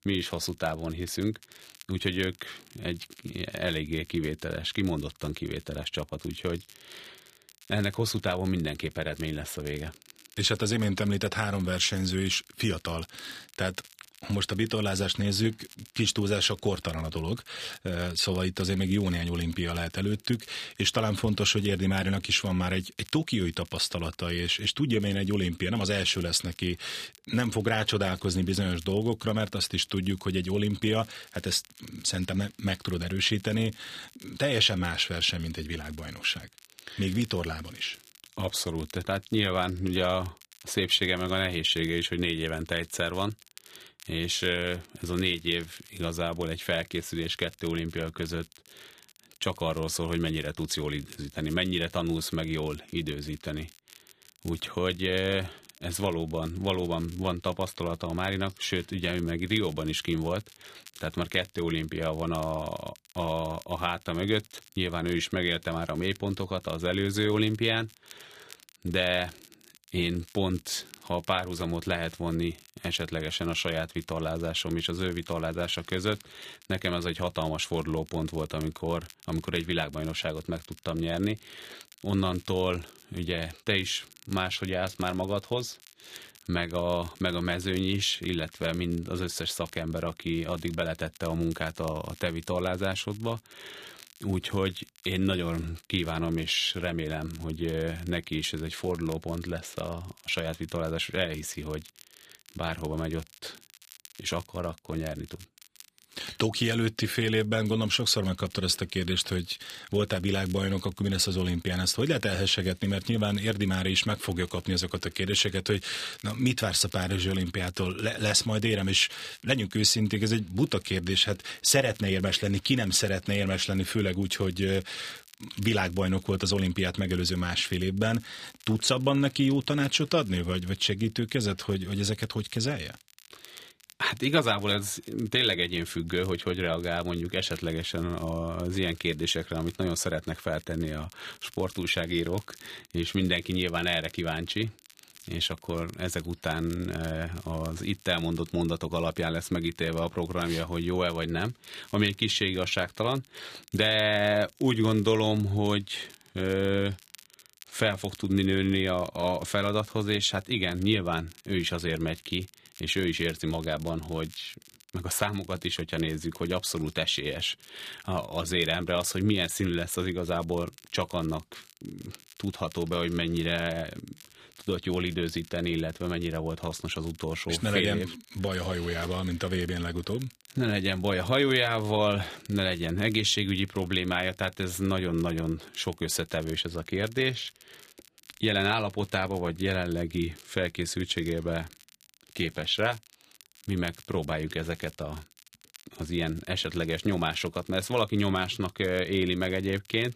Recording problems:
crackle, like an old record; faint; 25 dB below the speech

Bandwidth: 14.5 kHz